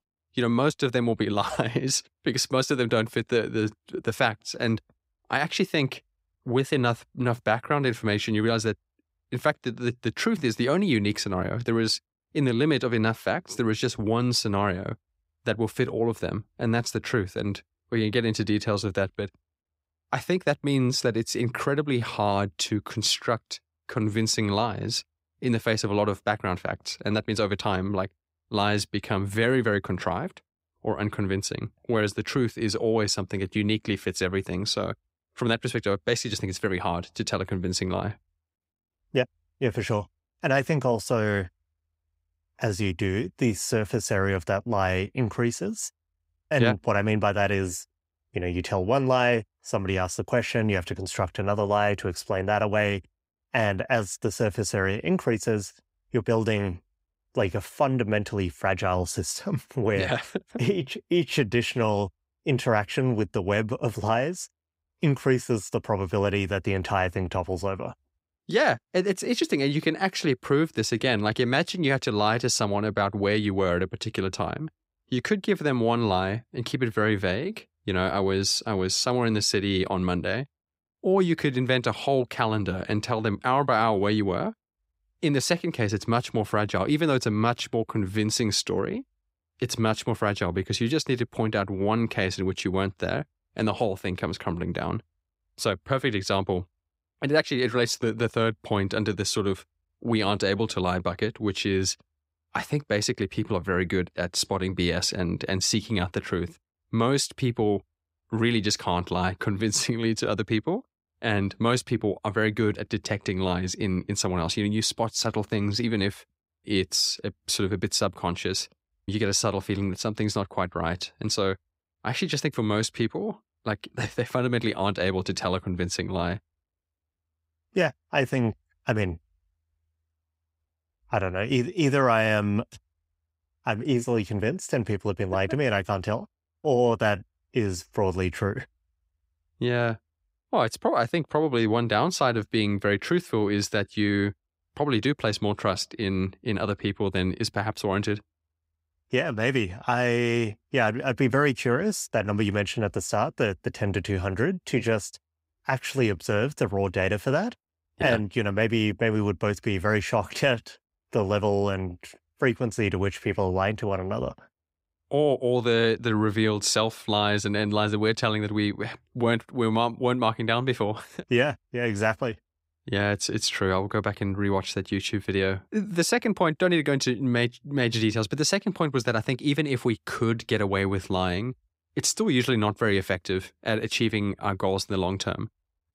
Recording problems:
none

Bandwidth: 15.5 kHz